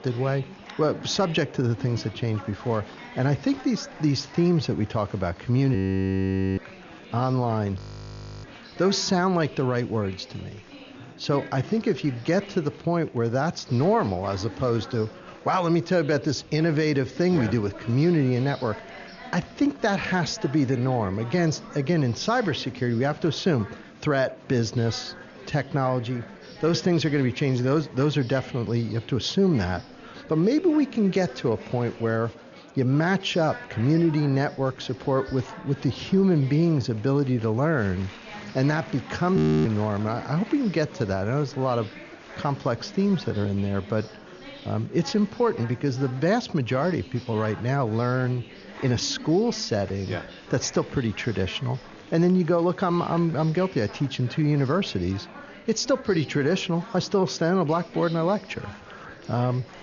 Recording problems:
high frequencies cut off; noticeable; nothing above 7 kHz
murmuring crowd; noticeable; throughout; 20 dB below the speech
audio freezing; at 6 s for 1 s, at 8 s for 0.5 s and at 39 s

